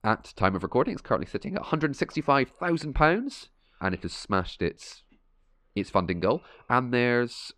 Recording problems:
muffled; slightly; fading above 3 kHz

